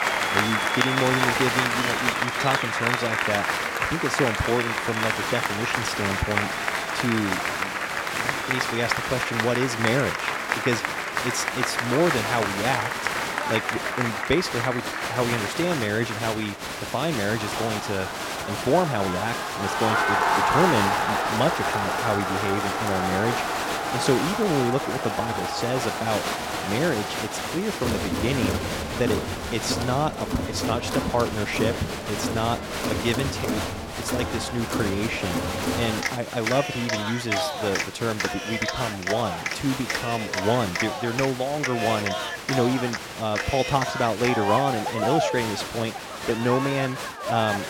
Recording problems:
crowd noise; very loud; throughout; 1 dB above the speech

